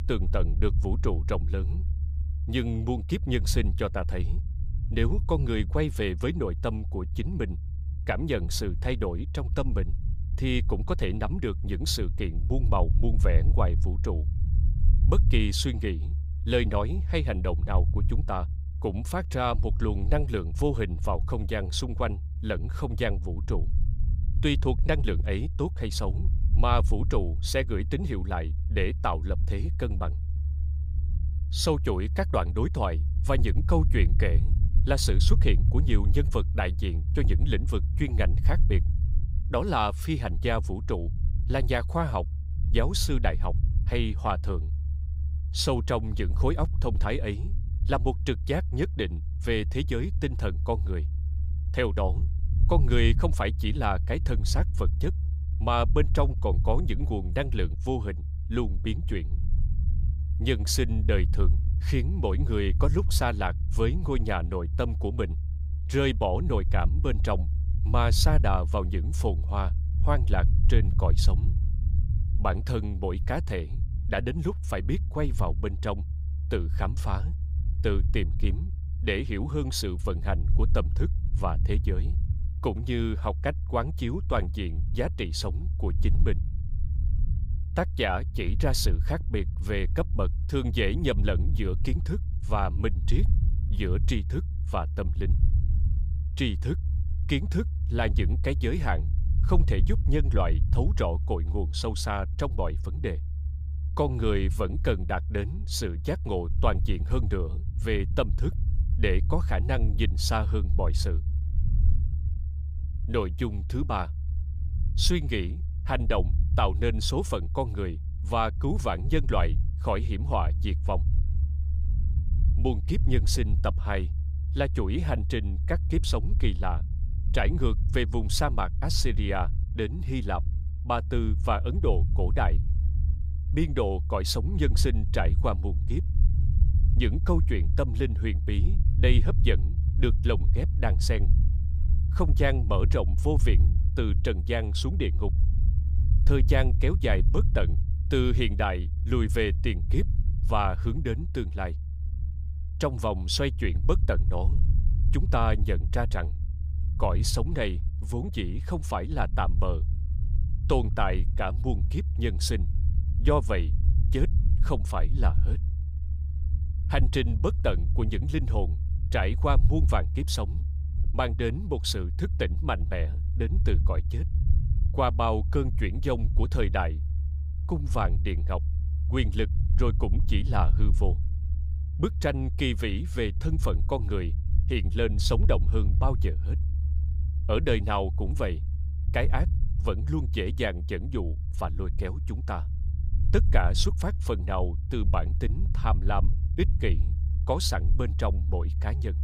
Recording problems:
low rumble; noticeable; throughout; 15 dB below the speech

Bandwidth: 15.5 kHz